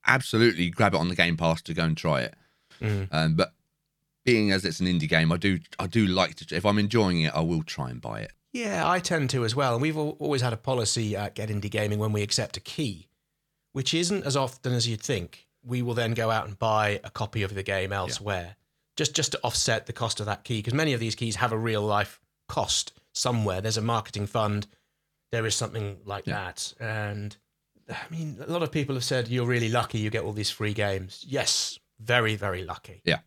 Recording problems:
none

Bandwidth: 18.5 kHz